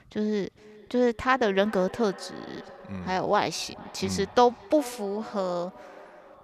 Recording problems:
echo of what is said; faint; throughout; 400 ms later, 20 dB below the speech
uneven, jittery; slightly; from 1 to 3.5 s

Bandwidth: 14.5 kHz